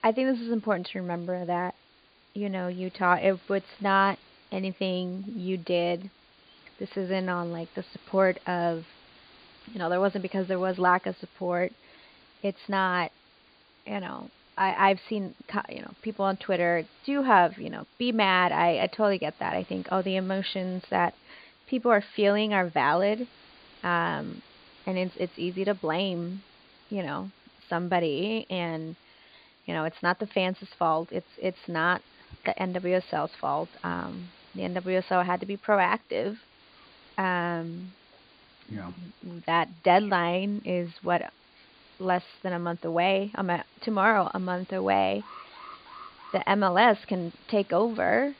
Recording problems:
high frequencies cut off; severe; nothing above 5 kHz
hiss; faint; throughout; 30 dB below the speech
alarm; faint; from 45 to 46 s; peak 15 dB below the speech

